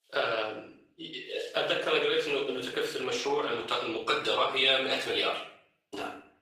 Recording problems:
off-mic speech; far
room echo; noticeable; dies away in 0.5 s
thin; somewhat; fading below 450 Hz
garbled, watery; slightly; nothing above 15 kHz

